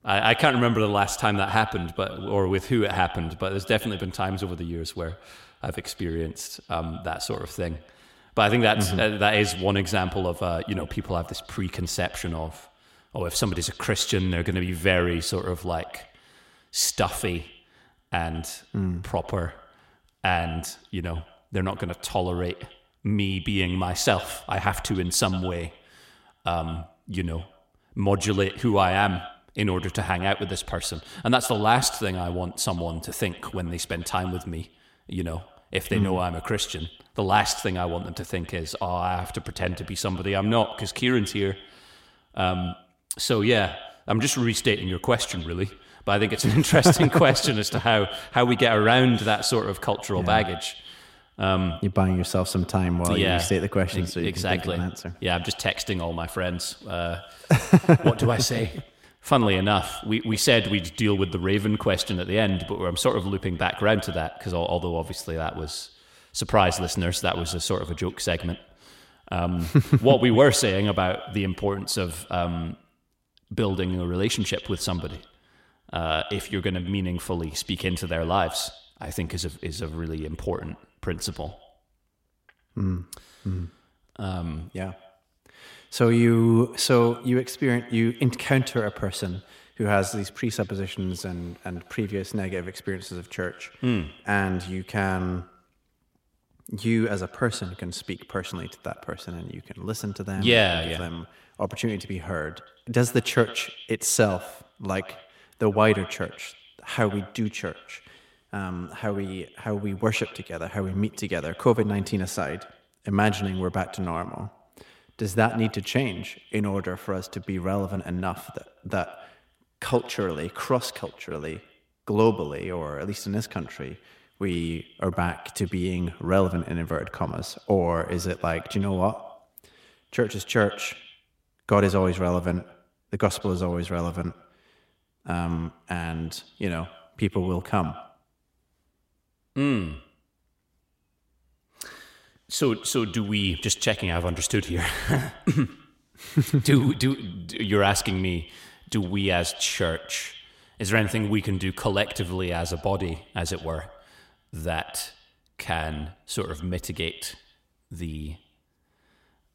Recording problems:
echo of what is said; noticeable; throughout; 100 ms later, 15 dB below the speech

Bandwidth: 16 kHz